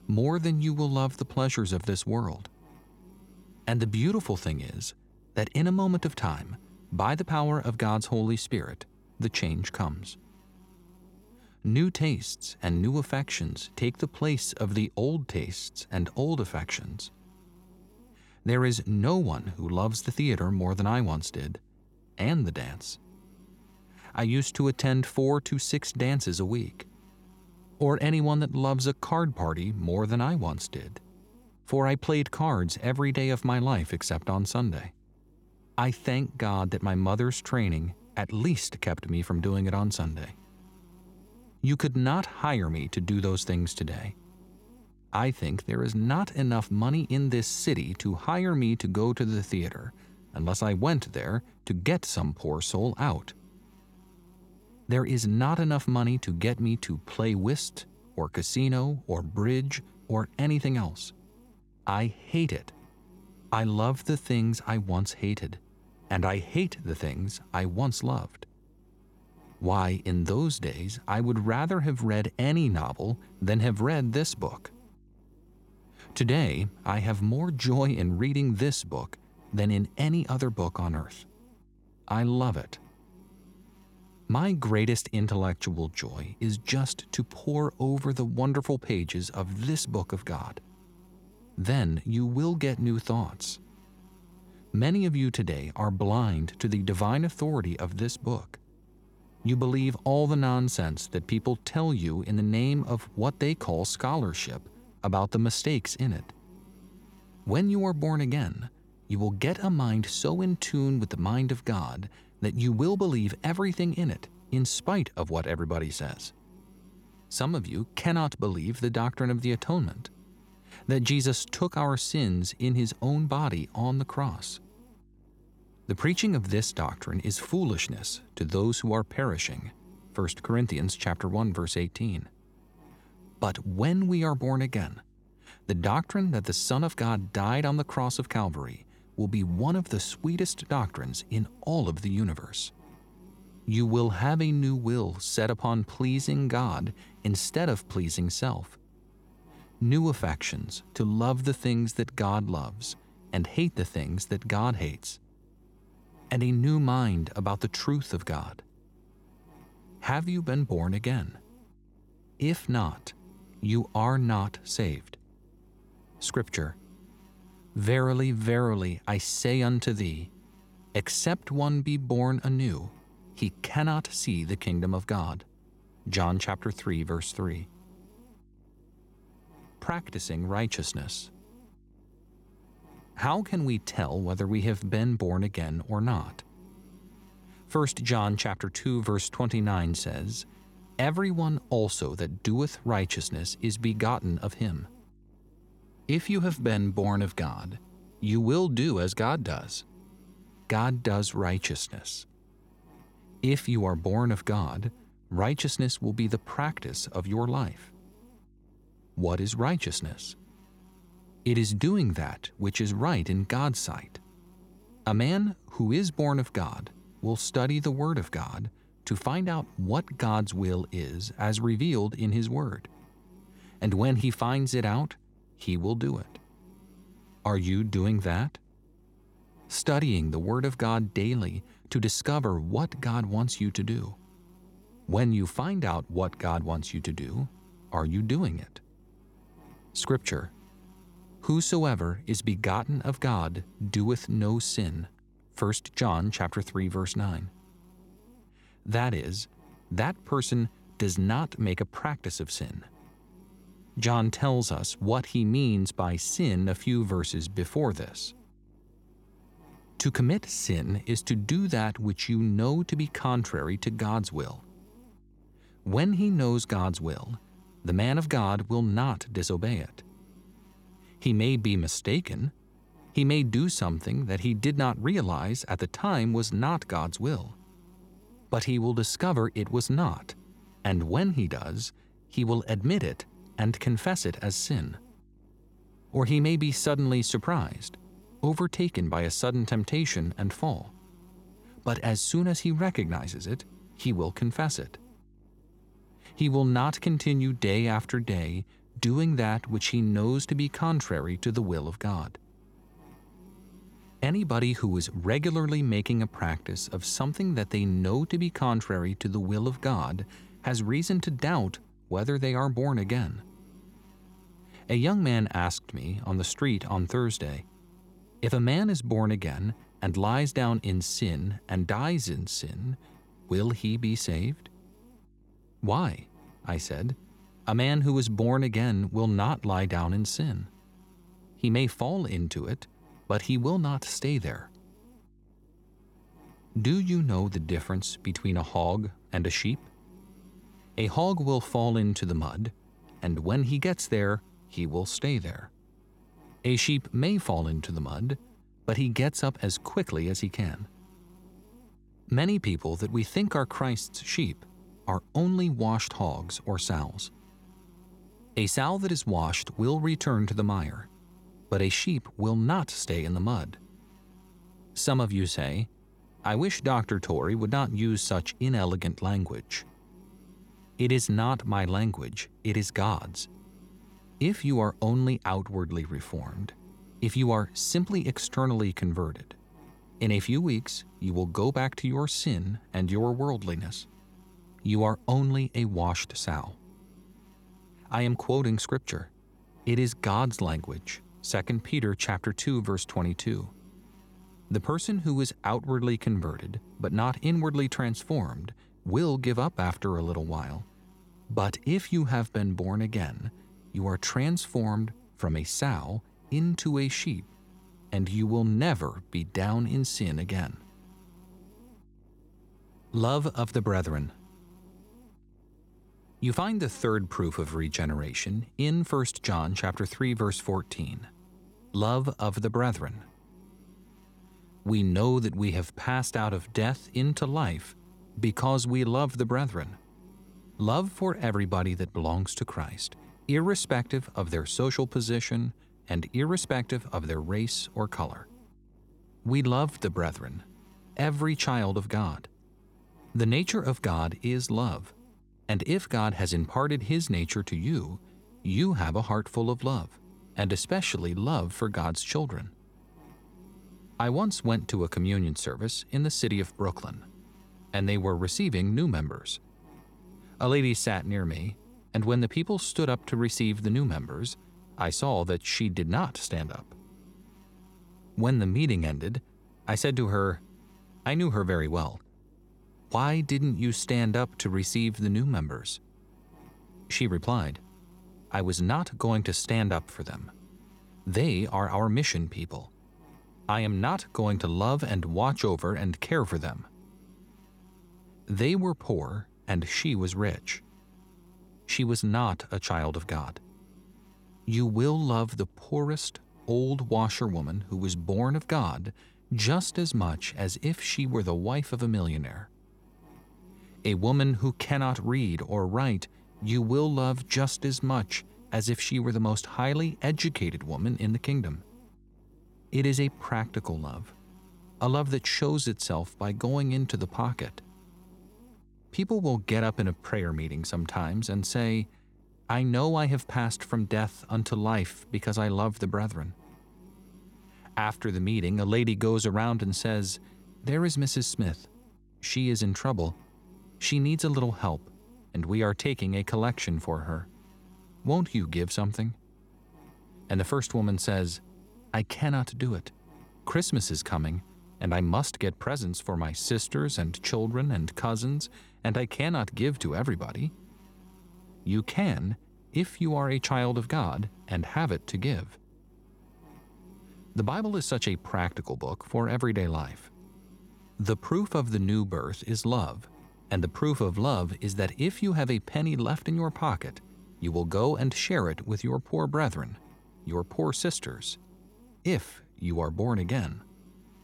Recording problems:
electrical hum; faint; throughout; 50 Hz, 30 dB below the speech

